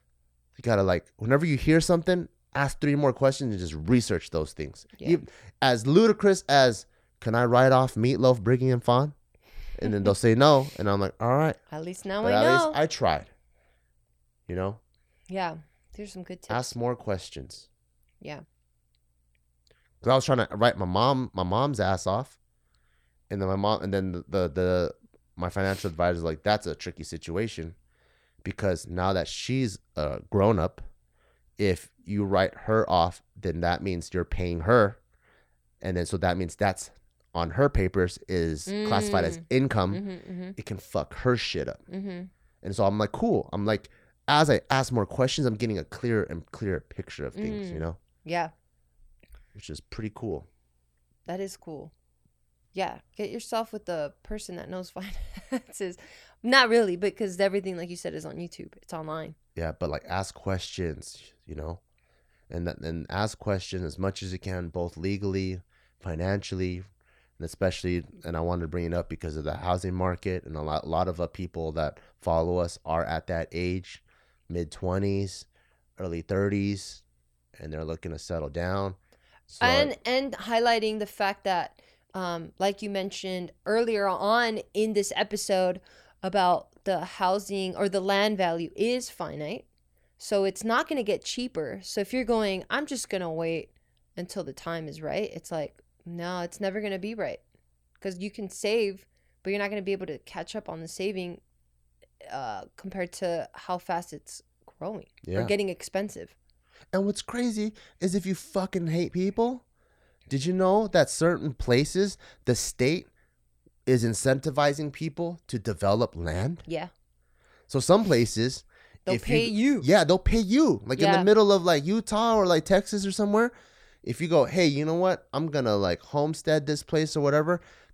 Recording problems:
none

